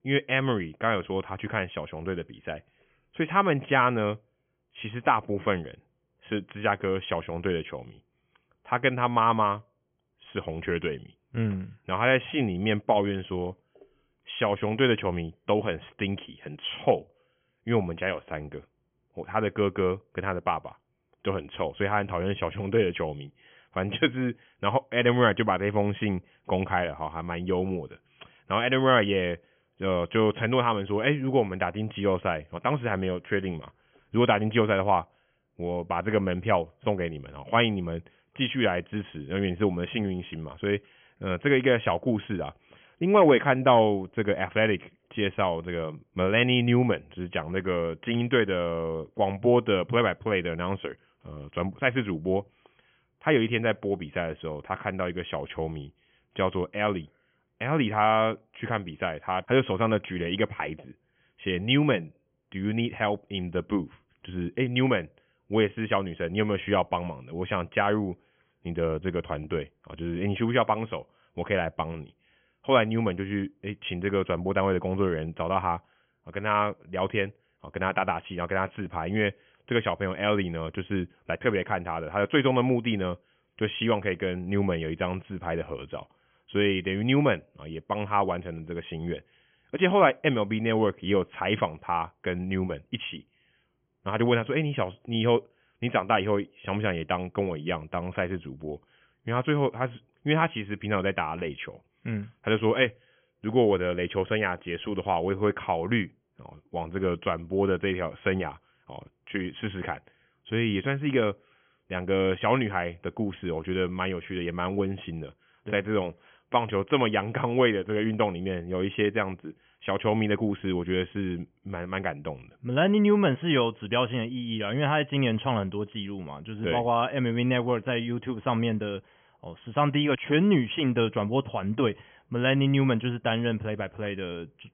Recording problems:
high frequencies cut off; severe; nothing above 3.5 kHz

